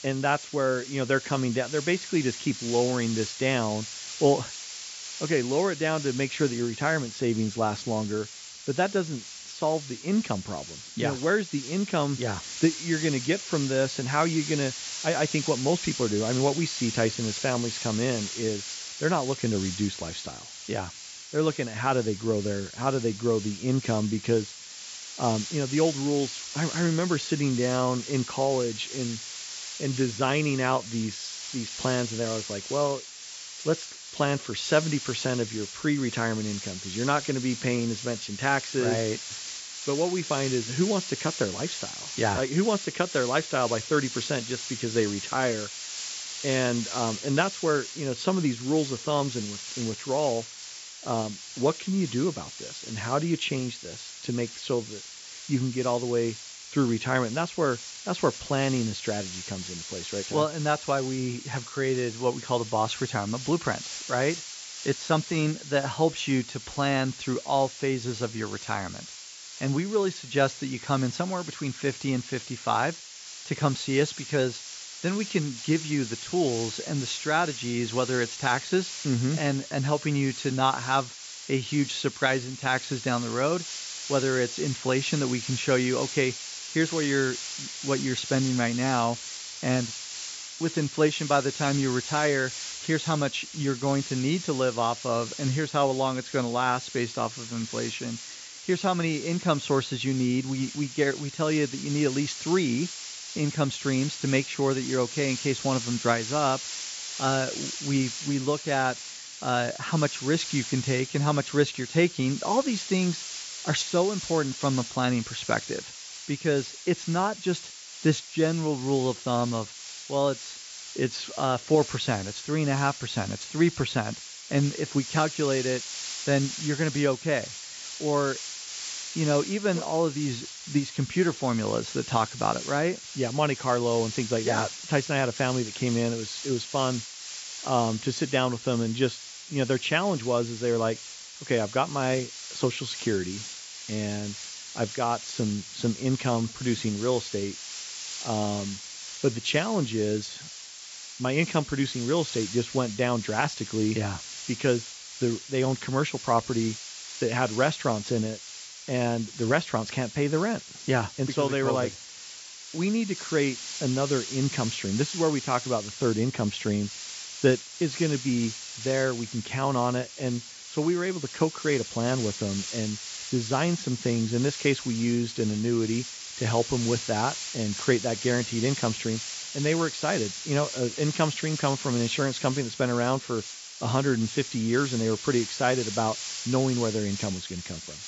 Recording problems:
high frequencies cut off; noticeable; nothing above 8 kHz
hiss; loud; throughout; 9 dB below the speech

